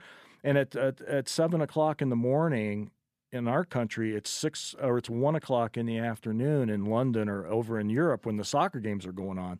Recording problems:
none

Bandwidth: 14.5 kHz